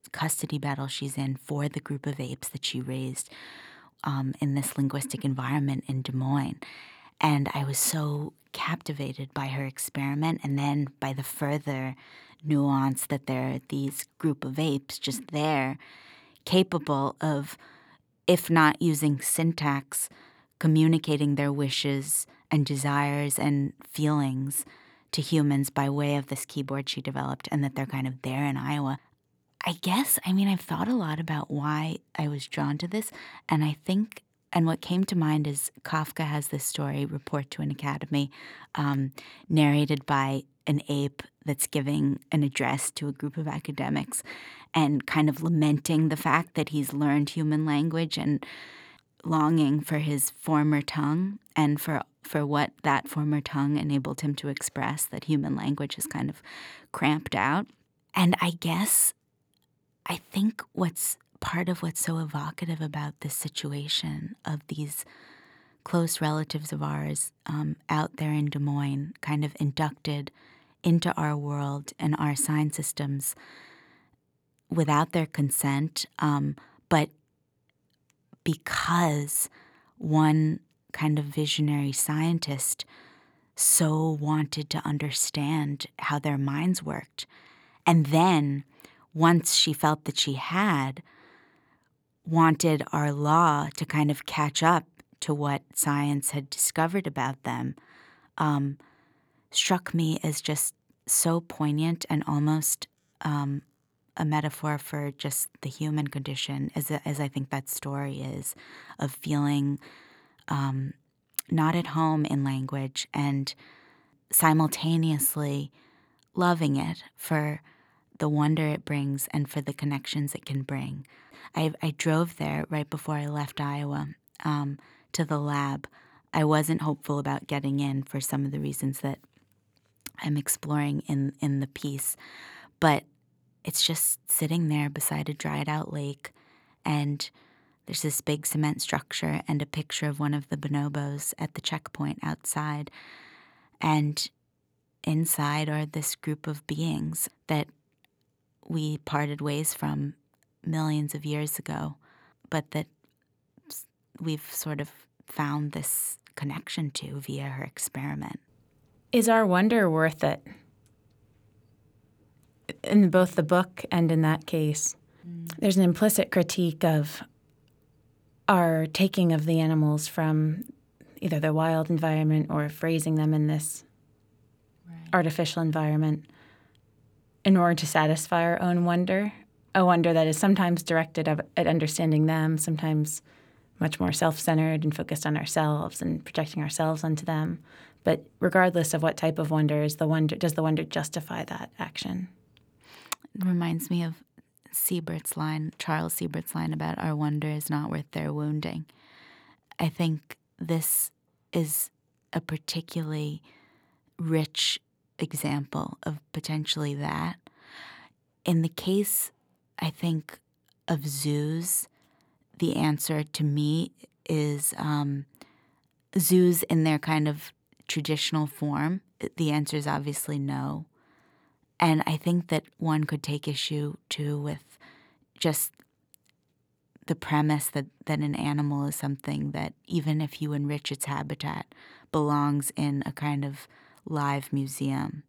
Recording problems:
none

